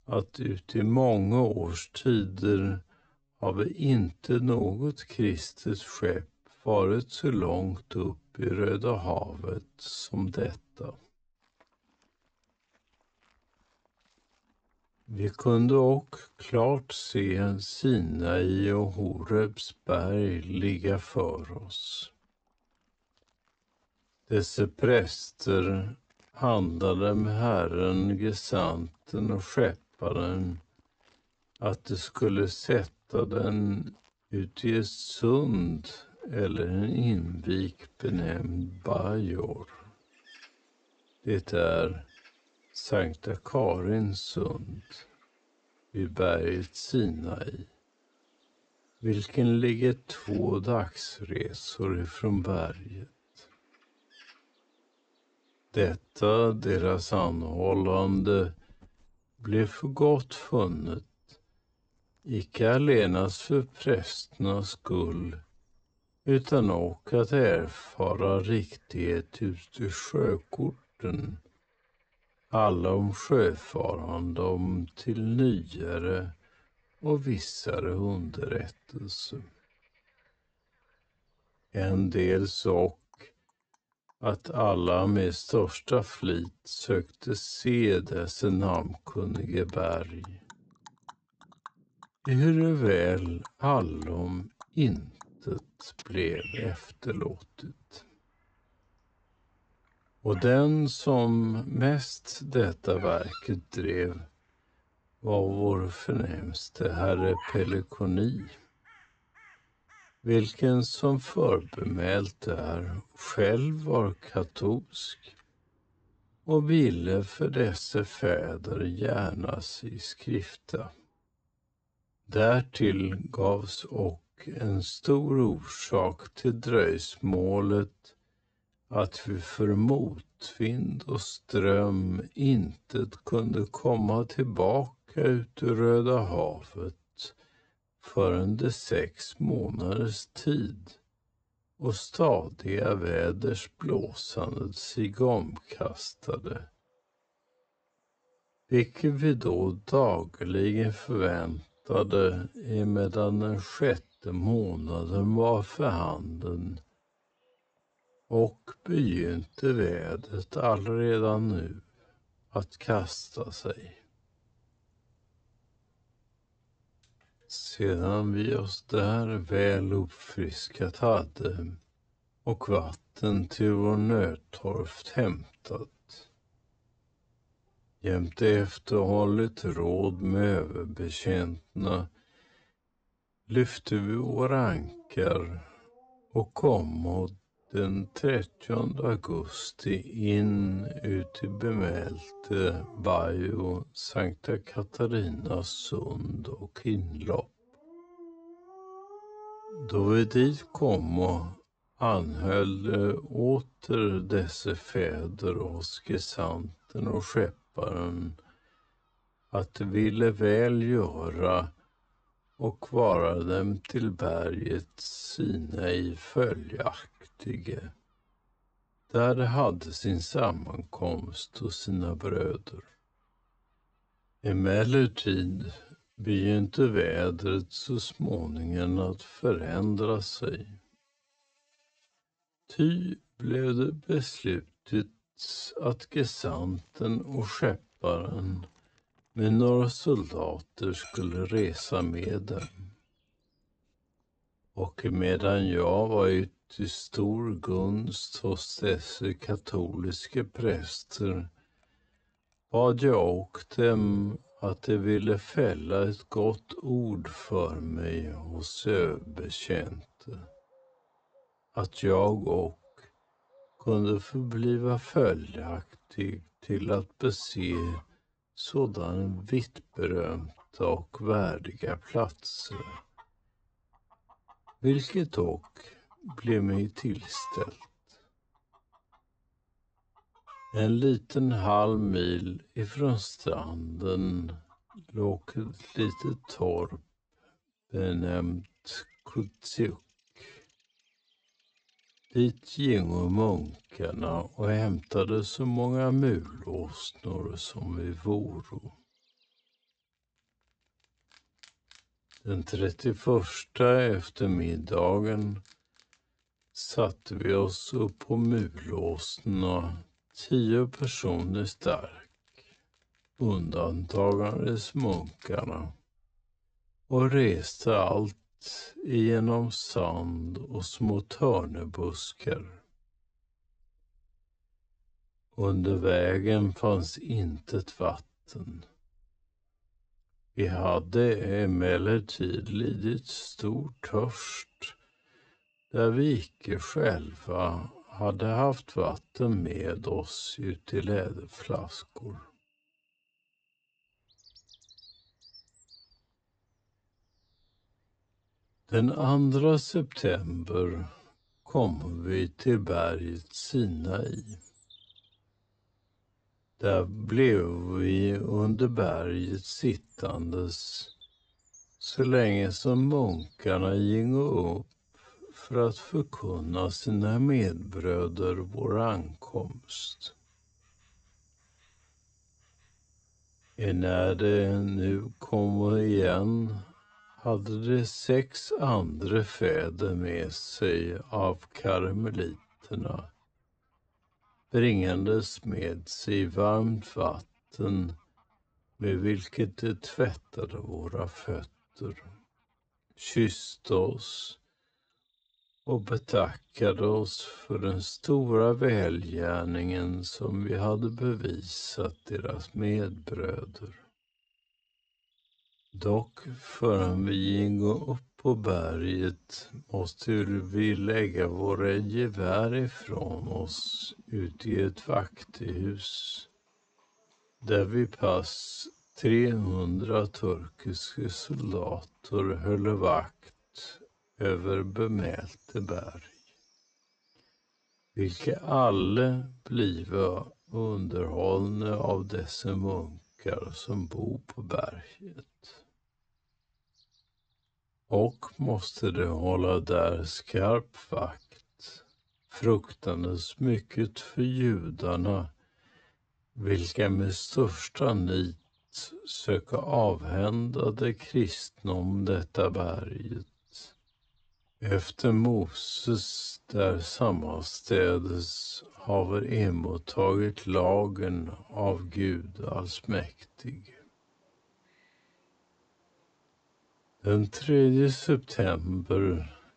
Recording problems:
wrong speed, natural pitch; too slow; 0.5 times normal speed
high frequencies cut off; noticeable; nothing above 8 kHz
animal sounds; faint; throughout; 25 dB below the speech

